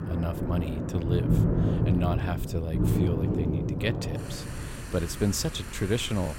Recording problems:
rain or running water; very loud; throughout; 1 dB above the speech

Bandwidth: 16 kHz